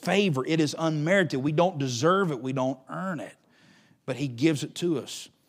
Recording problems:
none

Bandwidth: 15.5 kHz